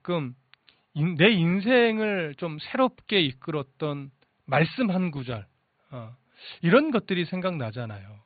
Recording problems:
high frequencies cut off; severe; nothing above 4.5 kHz

